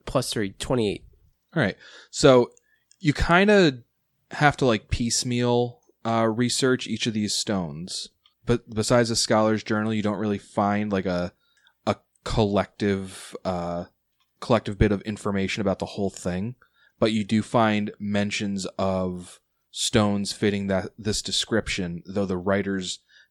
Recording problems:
none

